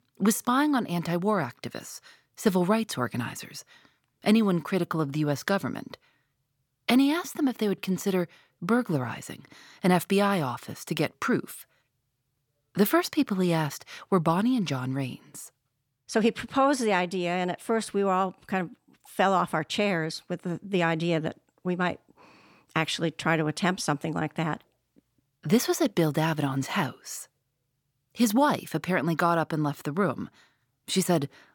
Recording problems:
none

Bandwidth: 17.5 kHz